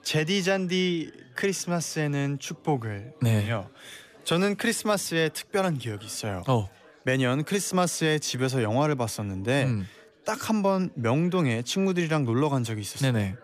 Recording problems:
chatter from many people; faint; throughout; 25 dB below the speech

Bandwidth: 14.5 kHz